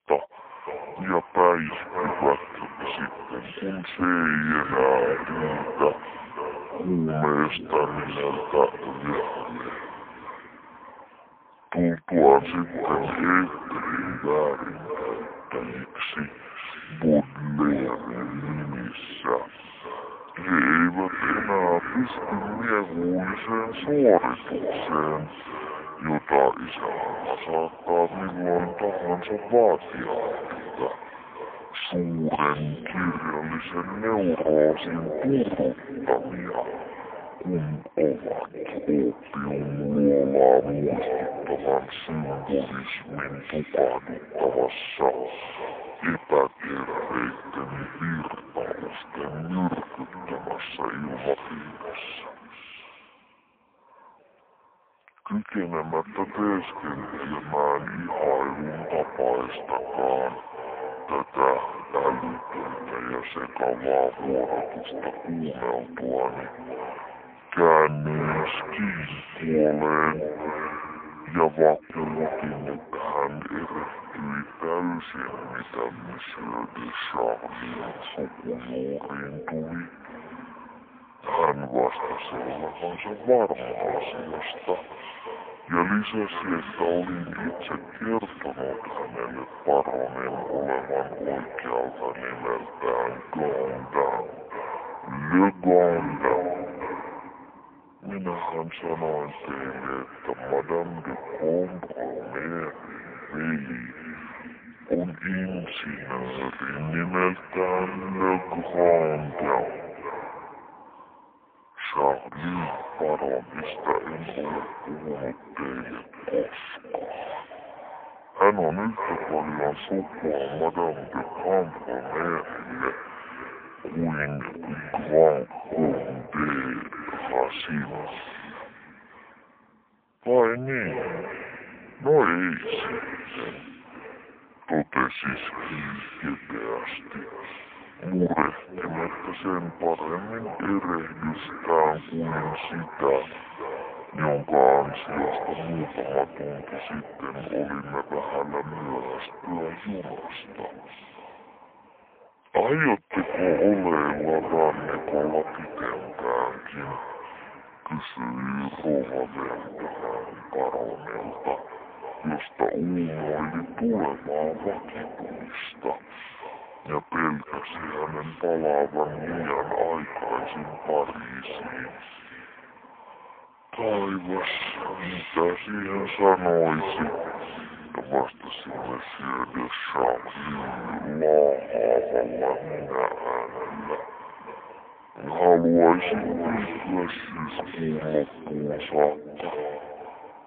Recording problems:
phone-call audio; poor line
echo of what is said; strong; throughout; 570 ms later, 10 dB below the speech
wrong speed and pitch; too slow and too low; 0.6 times normal speed

